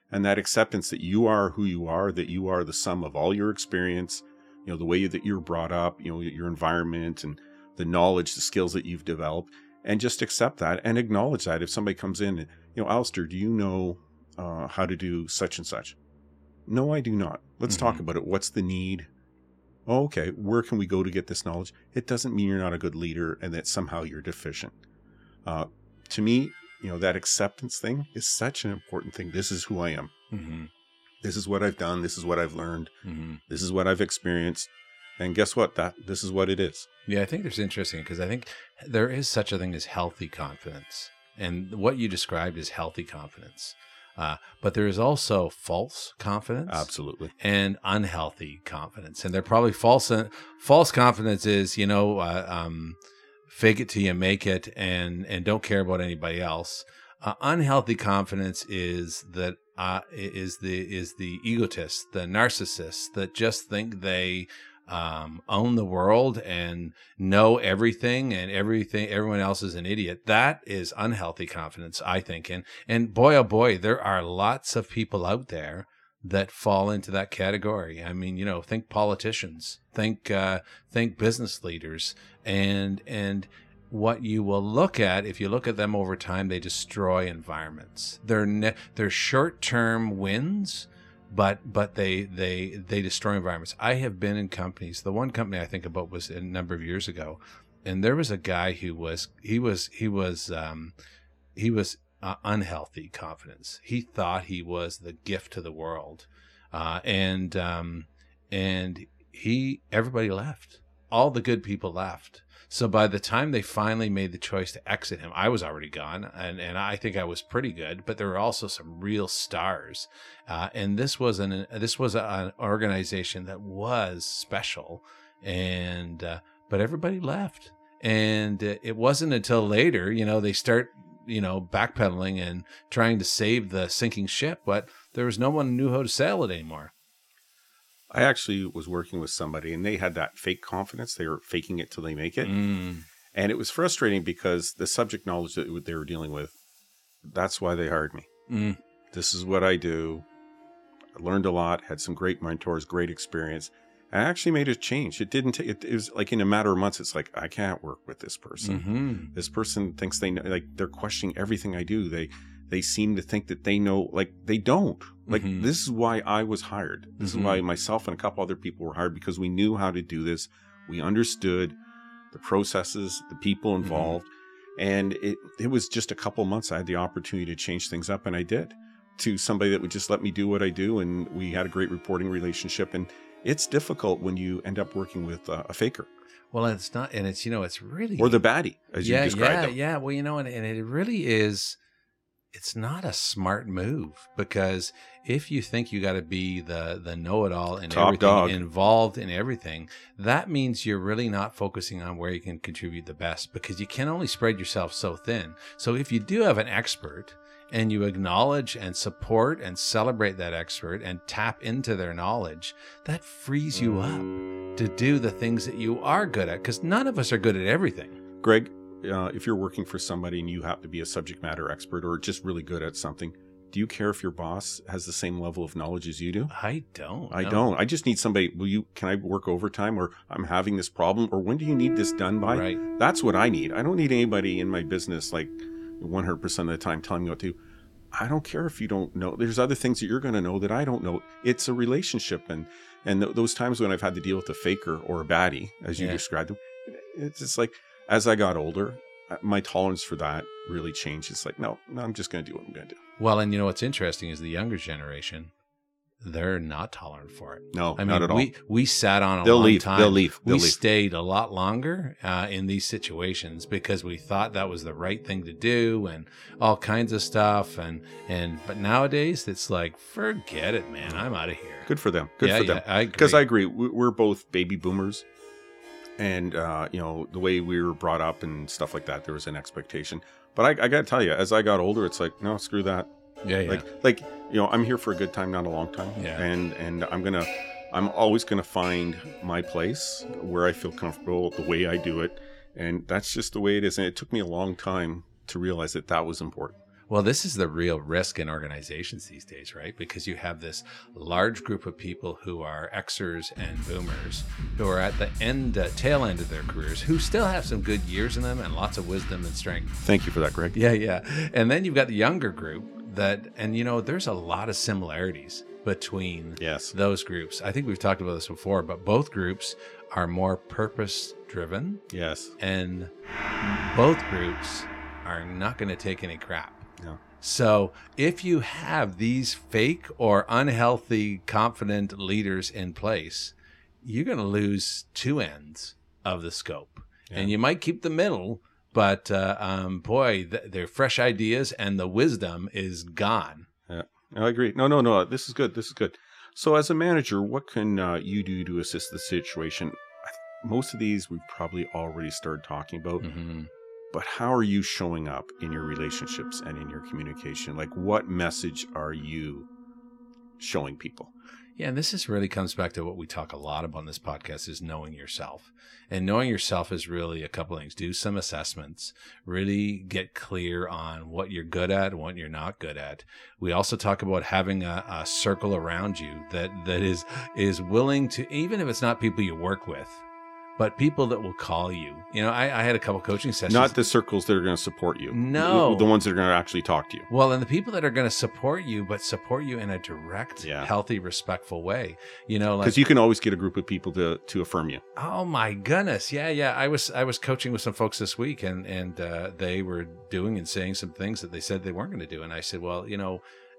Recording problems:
background music; noticeable; throughout; 15 dB below the speech

